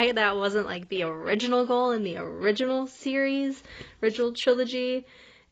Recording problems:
garbled, watery; badly; nothing above 7.5 kHz
abrupt cut into speech; at the start

